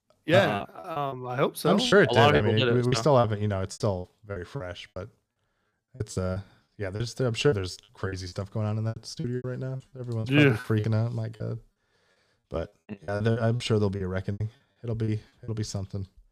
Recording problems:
choppy; very; 14% of the speech affected

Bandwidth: 14.5 kHz